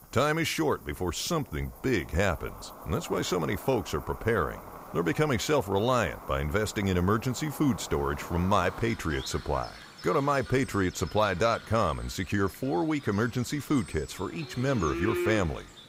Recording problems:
animal sounds; noticeable; throughout; 15 dB below the speech

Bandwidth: 15.5 kHz